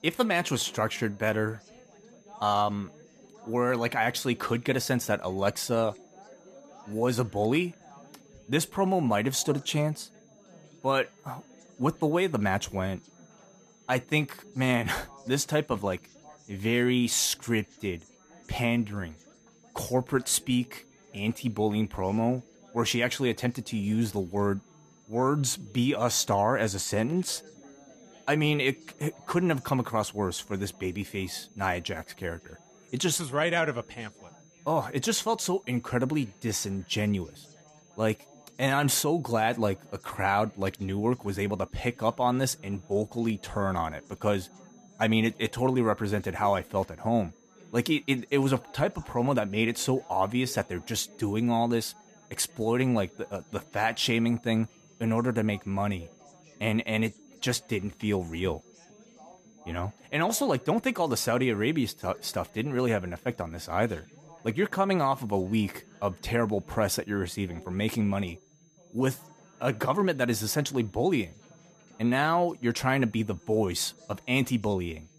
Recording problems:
high-pitched whine; faint; throughout; 6.5 kHz, 35 dB below the speech
background chatter; faint; throughout; 4 voices, 25 dB below the speech

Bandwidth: 14.5 kHz